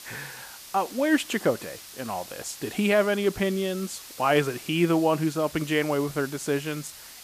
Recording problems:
hiss; noticeable; throughout; 15 dB below the speech

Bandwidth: 14.5 kHz